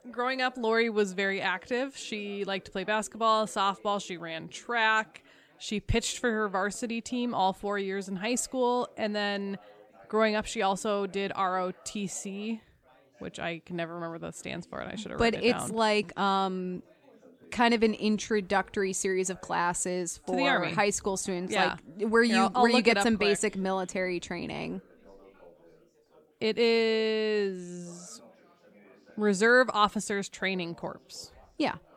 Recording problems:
background chatter; faint; throughout; 3 voices, 30 dB below the speech

